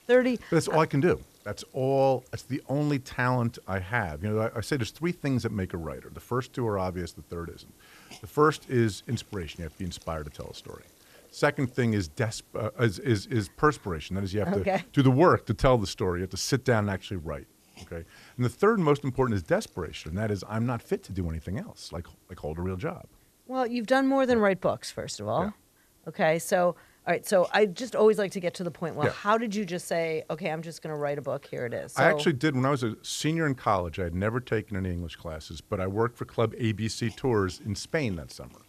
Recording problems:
hiss; faint; throughout; 30 dB below the speech

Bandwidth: 14 kHz